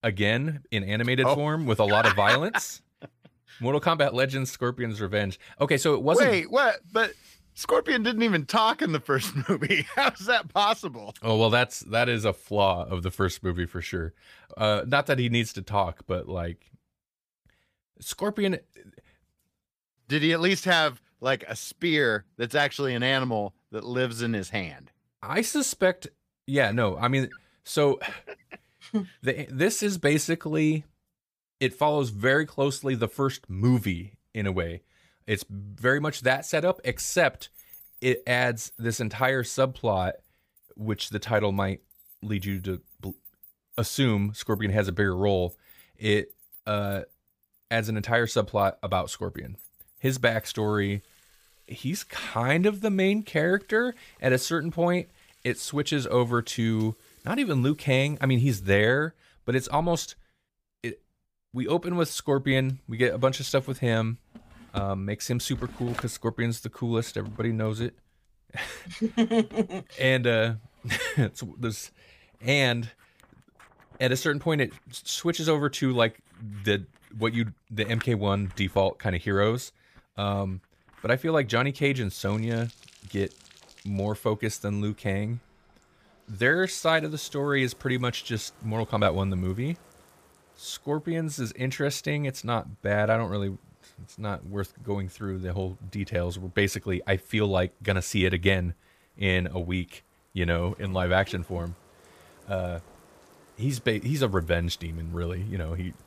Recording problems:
household noises; faint; from 36 s on; 25 dB below the speech

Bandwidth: 15 kHz